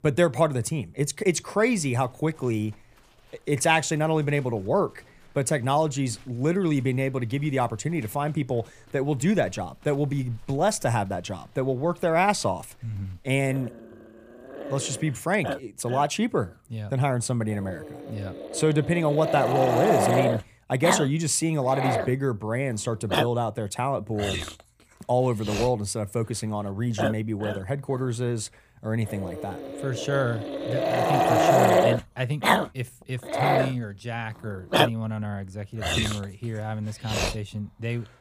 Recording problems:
animal sounds; loud; throughout; as loud as the speech

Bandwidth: 15 kHz